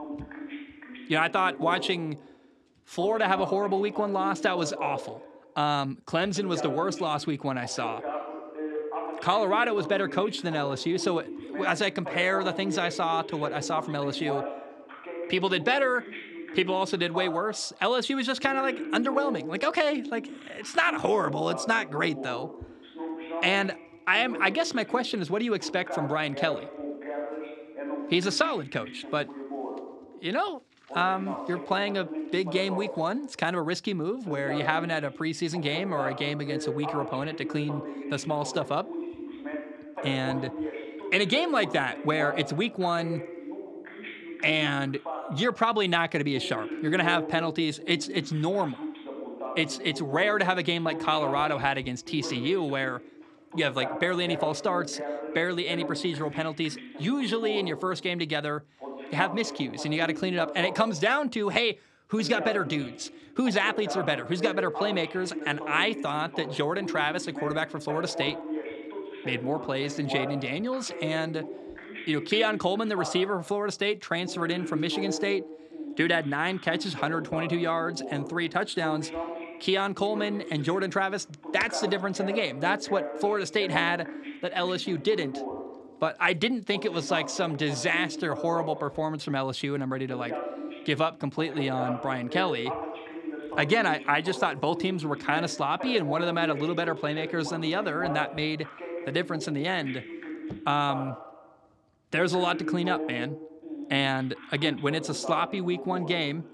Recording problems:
voice in the background; loud; throughout; 9 dB below the speech

